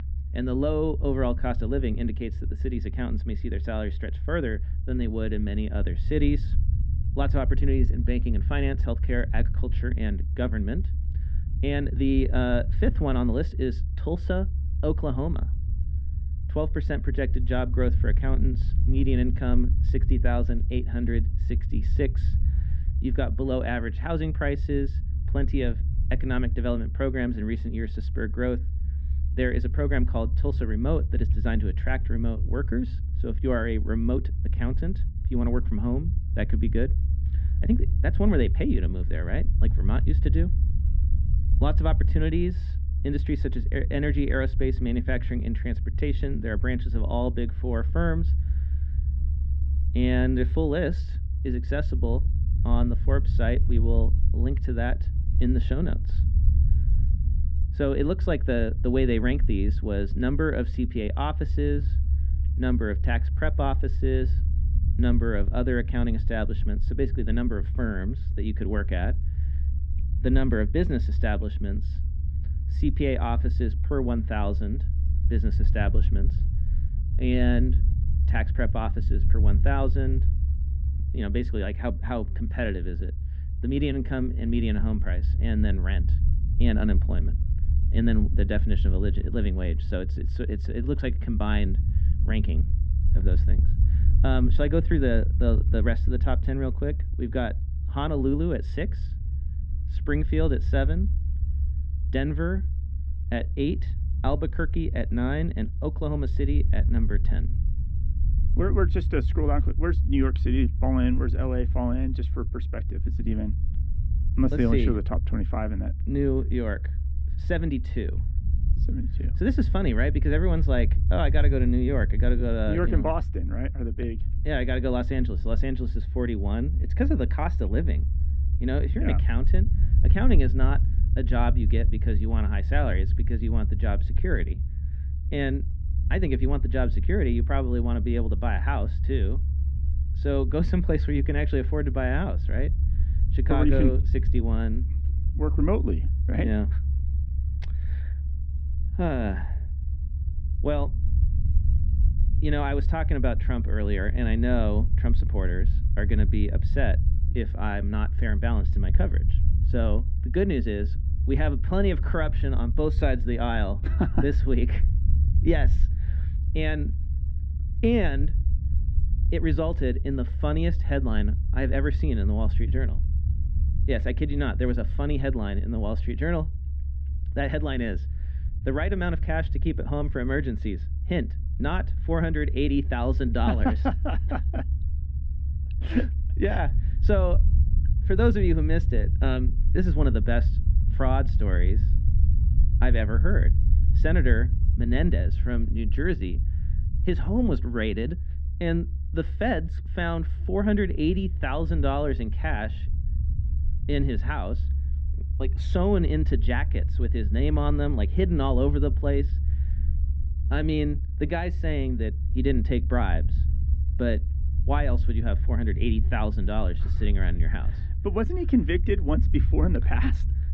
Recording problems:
muffled; slightly; fading above 3 kHz
low rumble; noticeable; throughout; 15 dB below the speech

